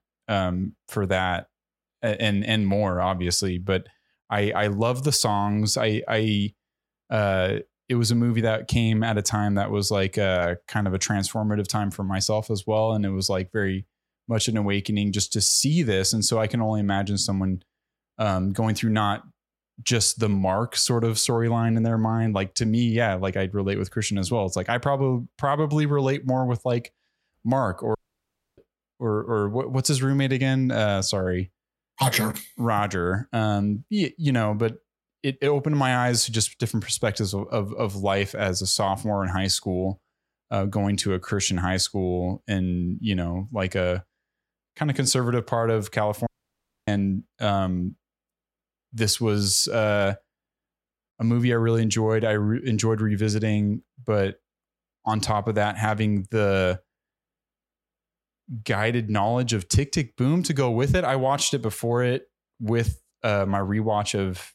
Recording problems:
audio cutting out; at 28 s for 0.5 s and at 46 s for 0.5 s

